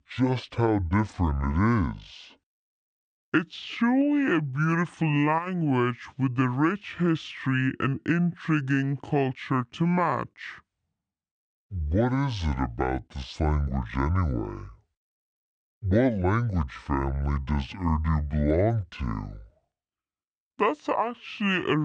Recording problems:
wrong speed and pitch; too slow and too low; 0.6 times normal speed
abrupt cut into speech; at the end

